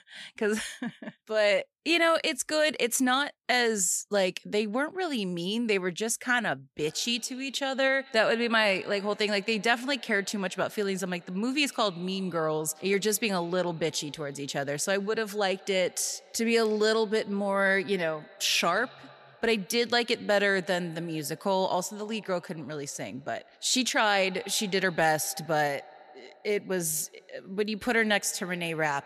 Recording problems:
echo of what is said; faint; from 7 s on; 90 ms later, 25 dB below the speech

